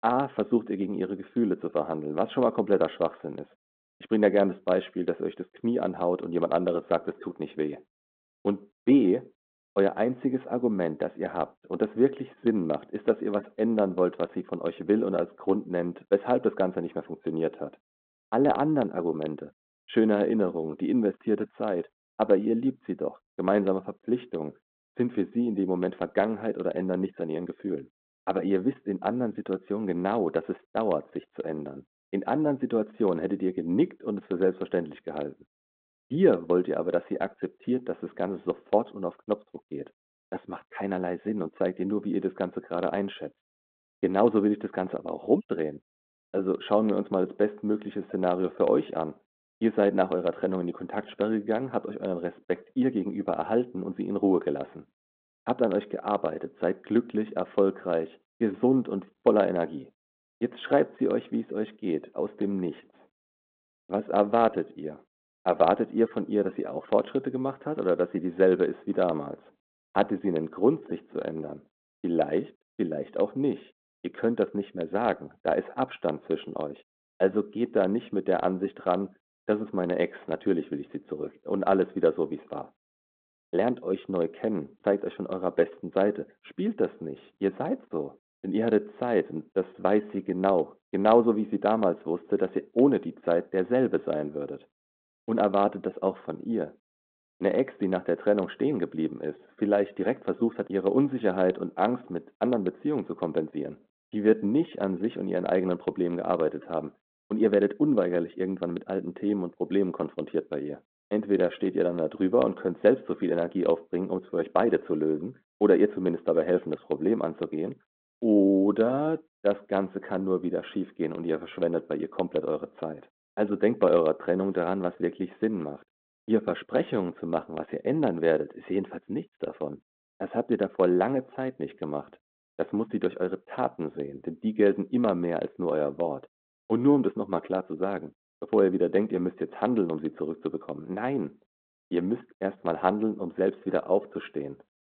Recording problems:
phone-call audio; nothing above 4 kHz
muffled; very slightly; fading above 1.5 kHz

